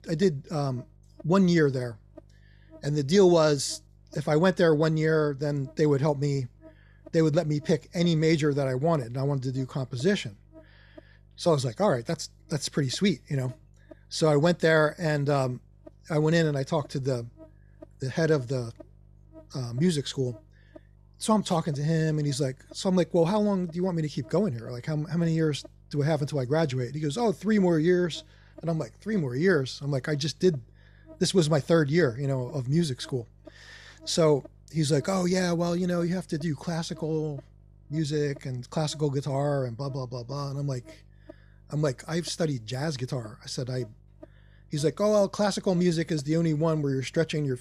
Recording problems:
electrical hum; faint; throughout; 50 Hz, 25 dB below the speech

